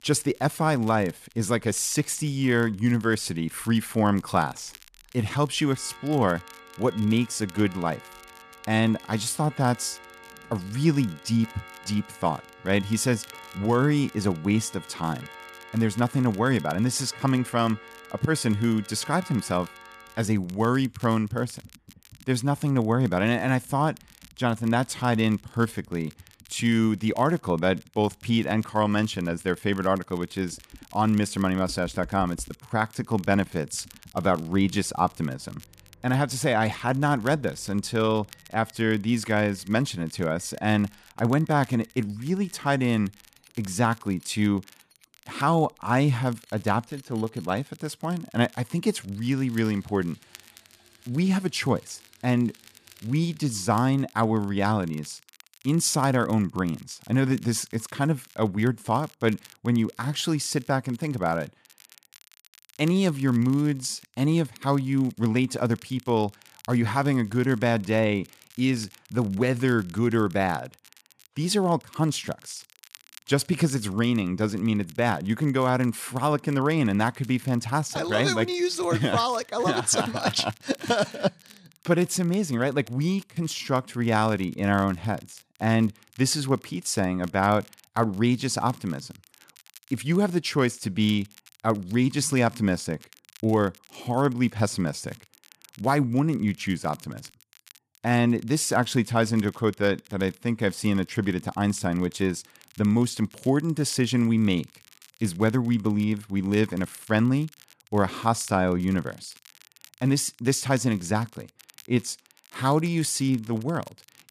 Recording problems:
household noises; faint; until 54 s; 25 dB below the speech
crackle, like an old record; faint; 25 dB below the speech

